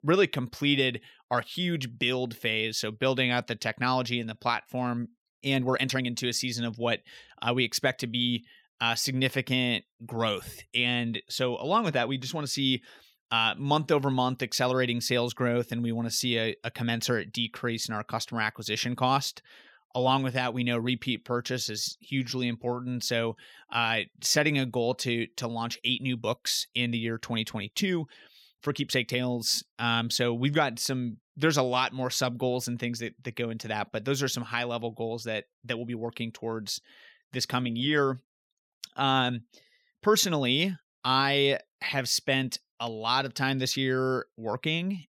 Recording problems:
uneven, jittery; strongly; from 4 to 42 s

